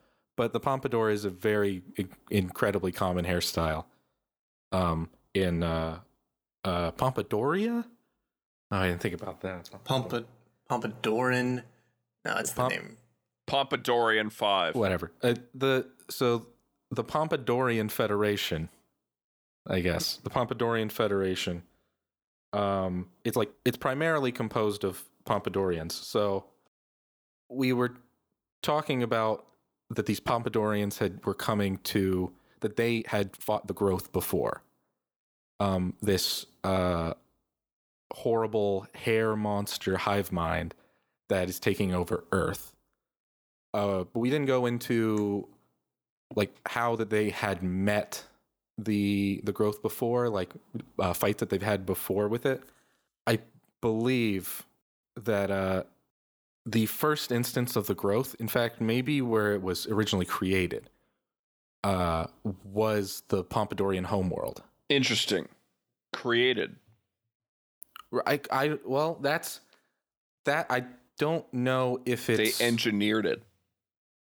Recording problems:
uneven, jittery; strongly; from 5 s to 1:00

